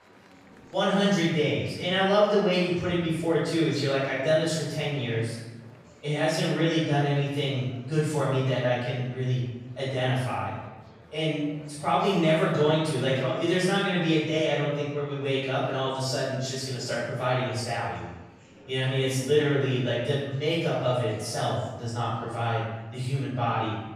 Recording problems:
room echo; strong; dies away in 0.9 s
off-mic speech; far
murmuring crowd; faint; throughout; 25 dB below the speech

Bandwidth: 15.5 kHz